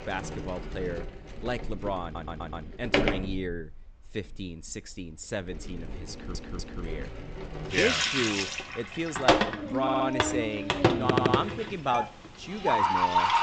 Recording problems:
high frequencies cut off; noticeable; nothing above 8 kHz
household noises; very loud; throughout; 3 dB above the speech
animal sounds; very loud; from 7 s on; 3 dB above the speech
audio stuttering; 4 times, first at 2 s

